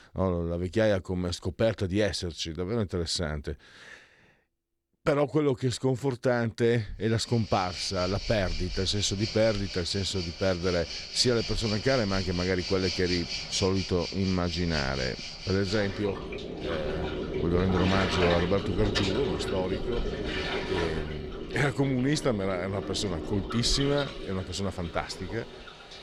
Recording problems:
rain or running water; loud; from 7.5 s on; 6 dB below the speech

